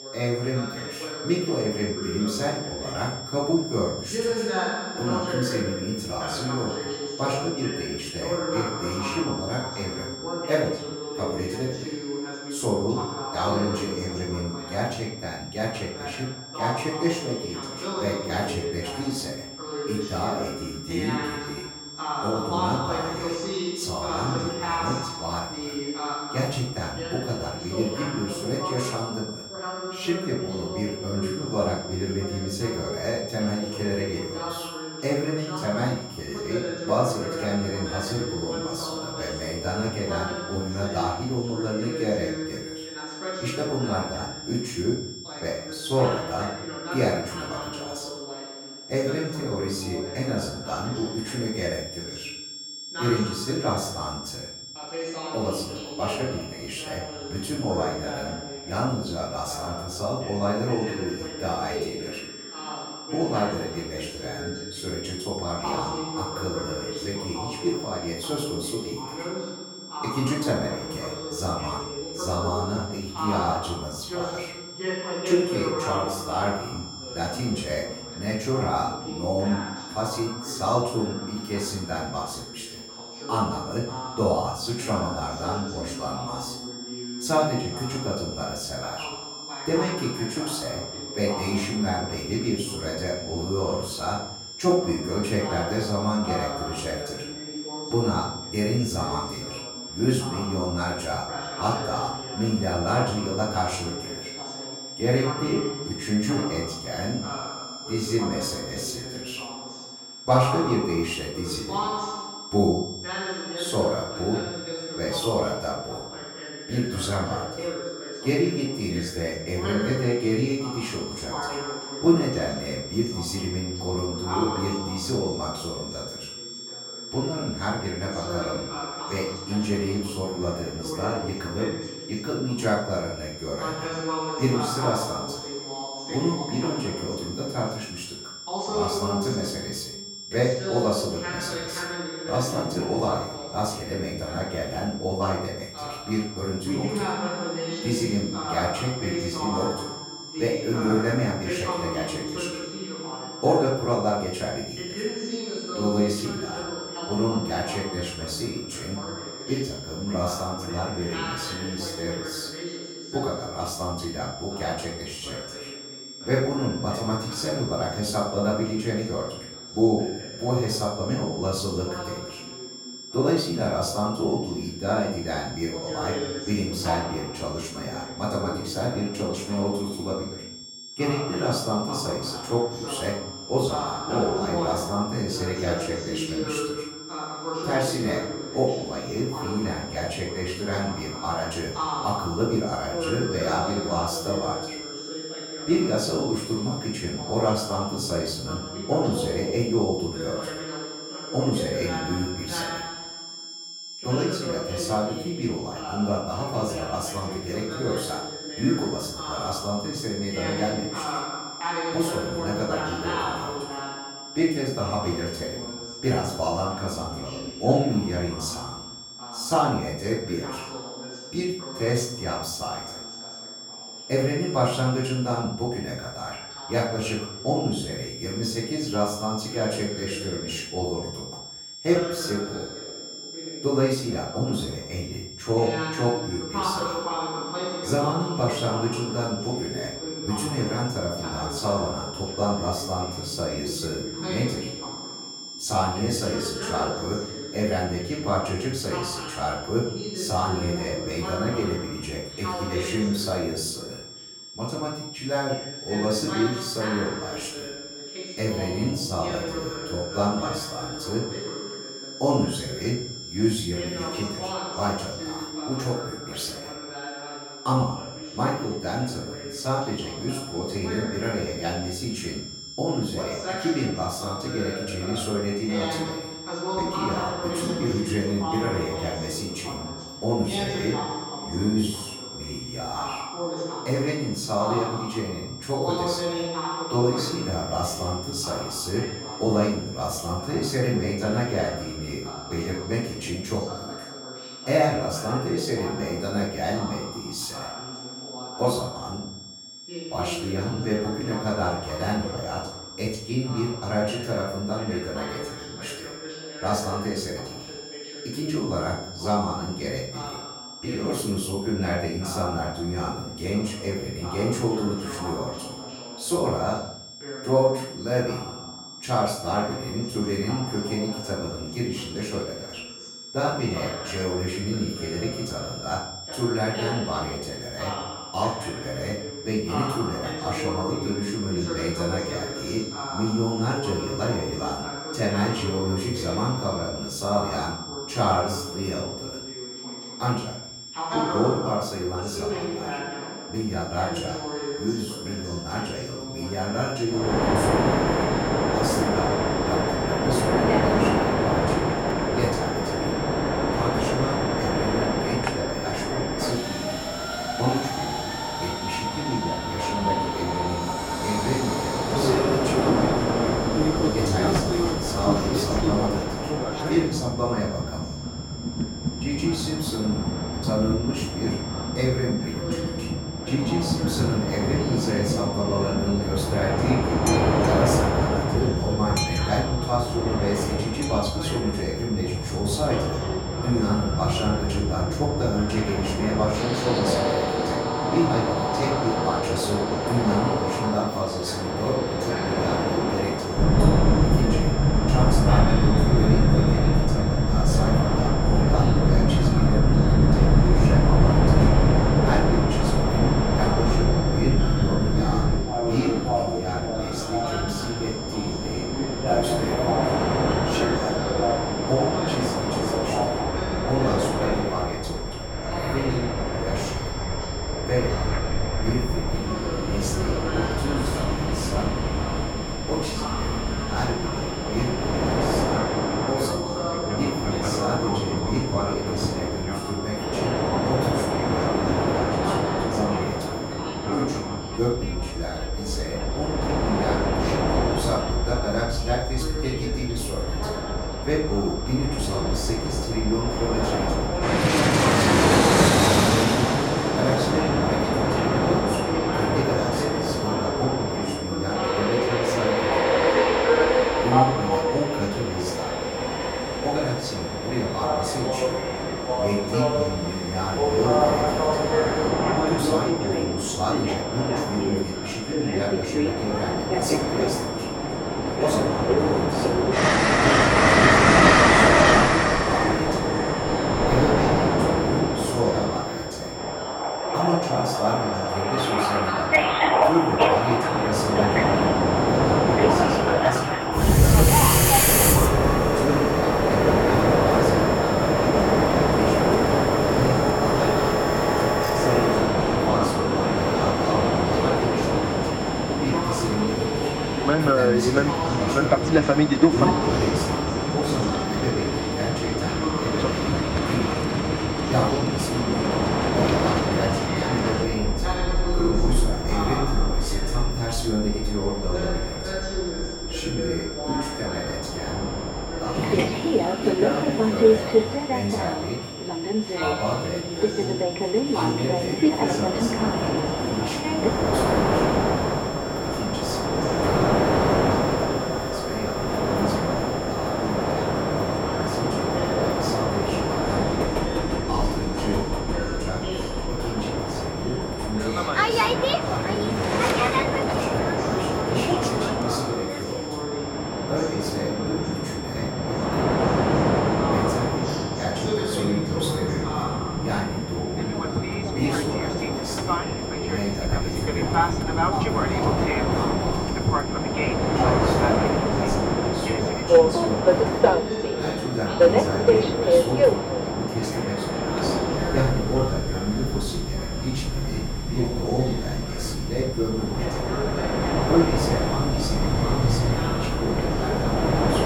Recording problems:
off-mic speech; far
room echo; noticeable; dies away in 0.6 s
train or aircraft noise; very loud; from 5:47 on; 5 dB above the speech
high-pitched whine; loud; throughout; 5.5 kHz, 9 dB below the speech
voice in the background; loud; throughout; 7 dB below the speech

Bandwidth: 17 kHz